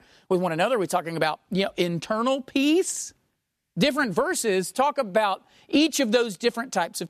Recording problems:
none

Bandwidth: 14 kHz